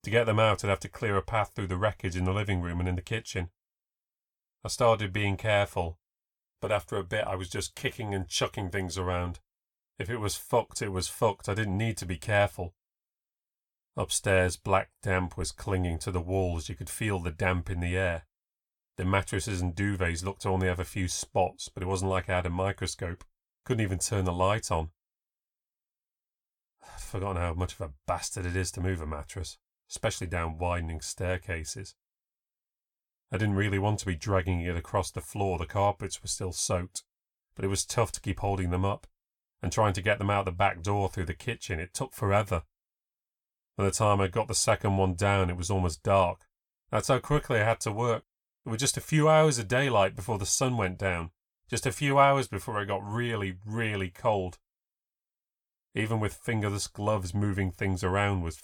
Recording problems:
none

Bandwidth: 18.5 kHz